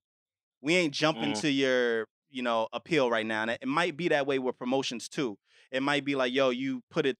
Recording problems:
none

